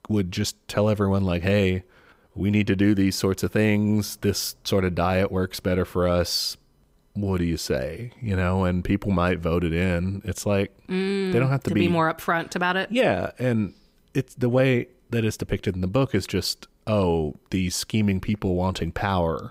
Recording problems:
none

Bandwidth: 15.5 kHz